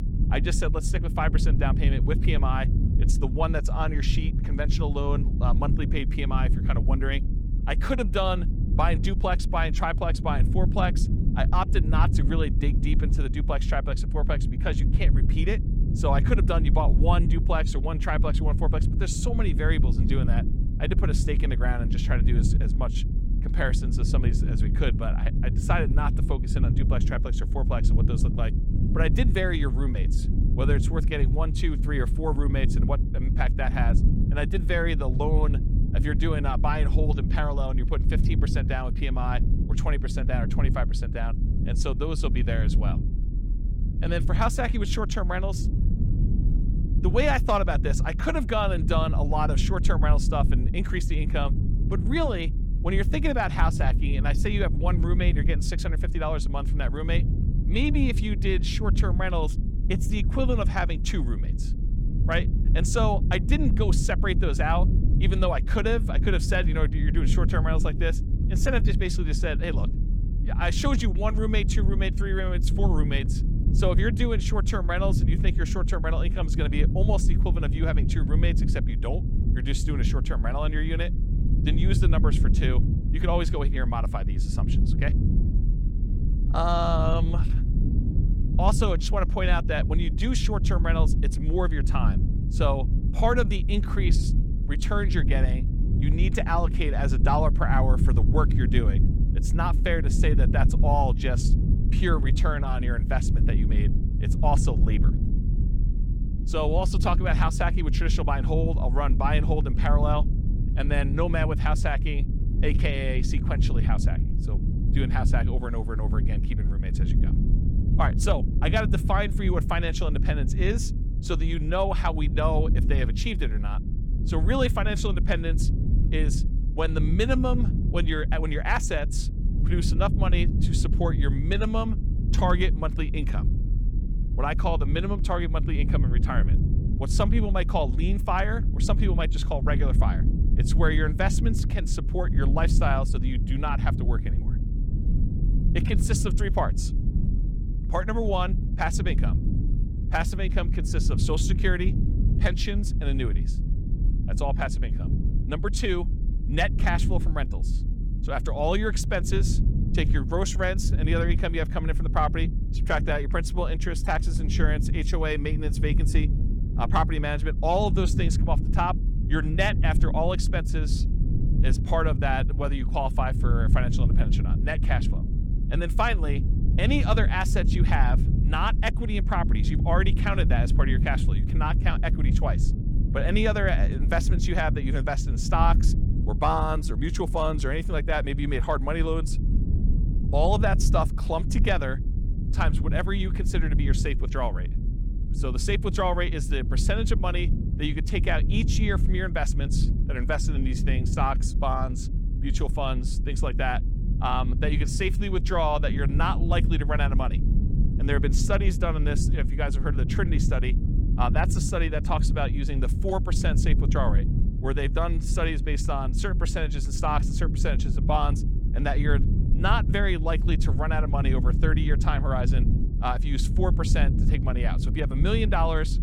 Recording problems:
low rumble; loud; throughout; 10 dB below the speech

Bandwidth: 18 kHz